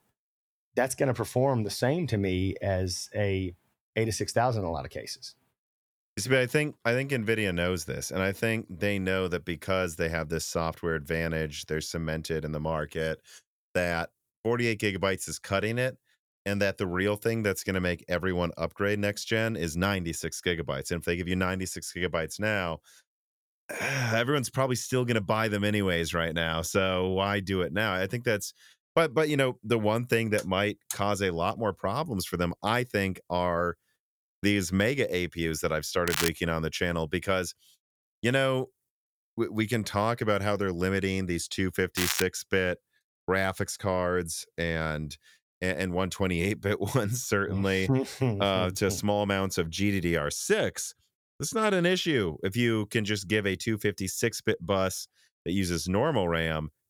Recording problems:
crackling; loud; at 36 s and at 42 s; 2 dB below the speech

